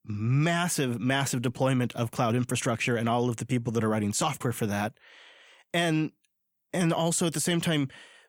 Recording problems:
none

